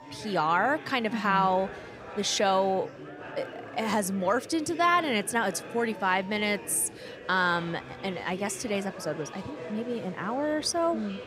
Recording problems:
murmuring crowd; noticeable; throughout; 15 dB below the speech

